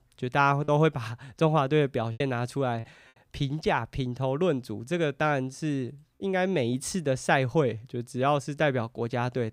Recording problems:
choppy; occasionally; from 0.5 to 3 s and at 6 s; 2% of the speech affected

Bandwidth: 15.5 kHz